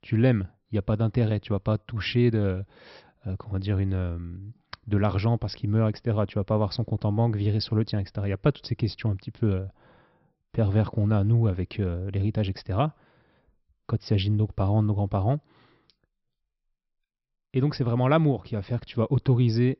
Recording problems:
high frequencies cut off; noticeable; nothing above 5.5 kHz

